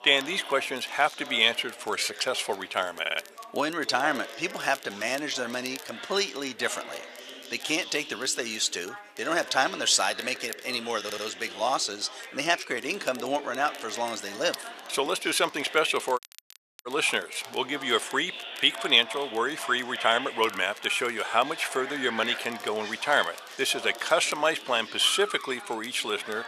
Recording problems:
thin; very; fading below 700 Hz
chatter from many people; noticeable; throughout; 15 dB below the speech
crackle, like an old record; faint; 20 dB below the speech
audio stuttering; at 3 s and at 11 s
audio cutting out; at 16 s for 0.5 s

